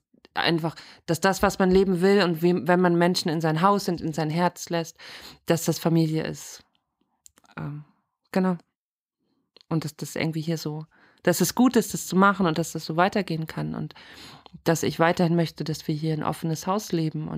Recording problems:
abrupt cut into speech; at the end

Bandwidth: 15.5 kHz